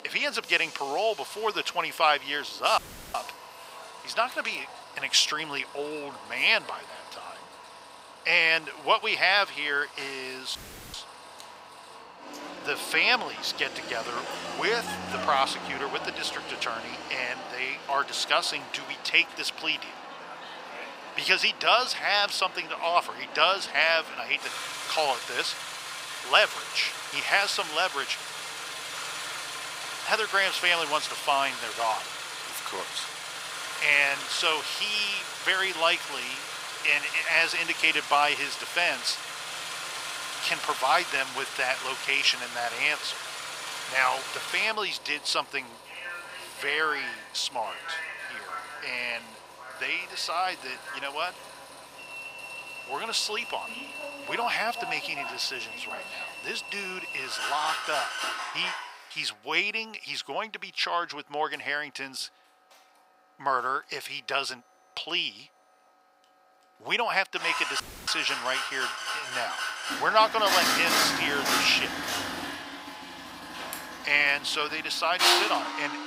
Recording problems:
thin; very; fading below 800 Hz
traffic noise; loud; throughout; 7 dB below the speech
audio cutting out; filled with static; at 3 s, at 11 s and at 1:08

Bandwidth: 15.5 kHz